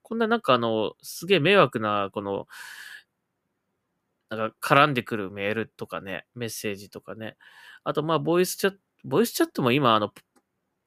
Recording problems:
none

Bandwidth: 15 kHz